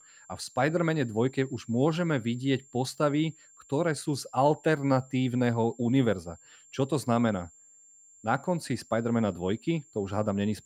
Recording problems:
high-pitched whine; faint; throughout; 7.5 kHz, 25 dB below the speech

